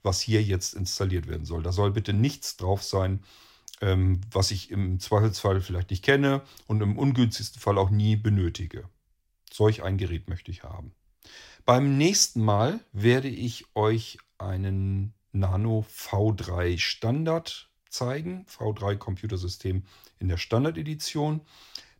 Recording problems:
none

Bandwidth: 16 kHz